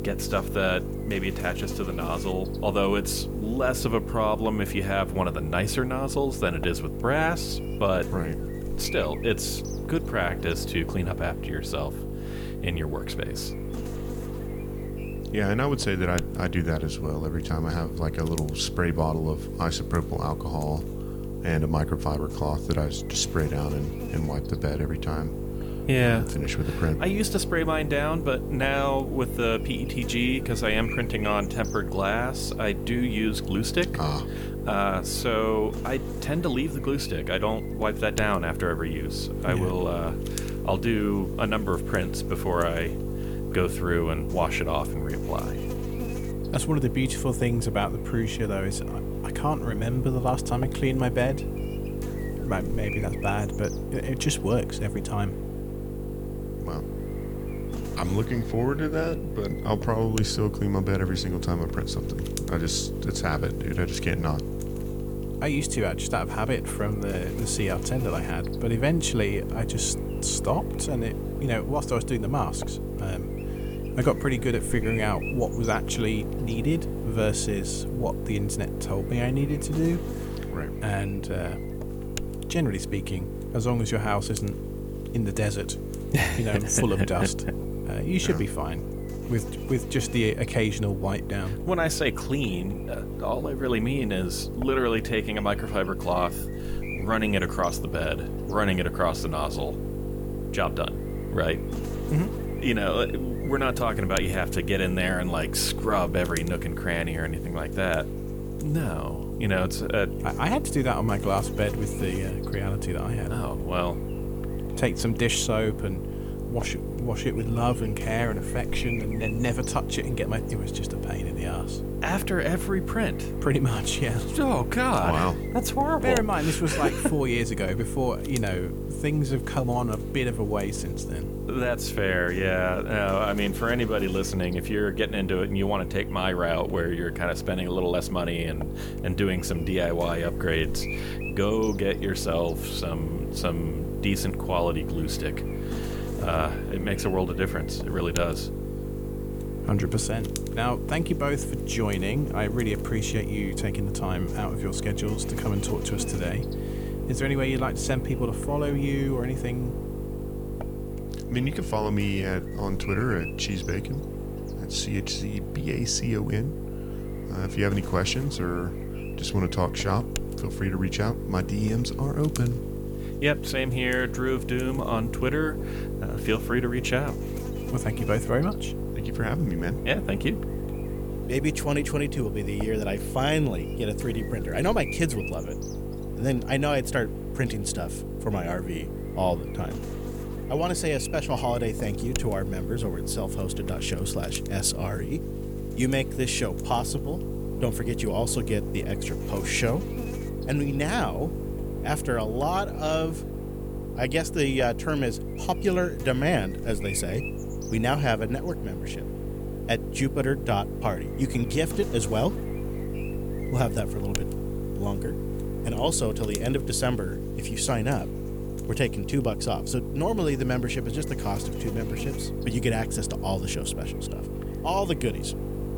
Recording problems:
electrical hum; loud; throughout; 50 Hz, 8 dB below the speech

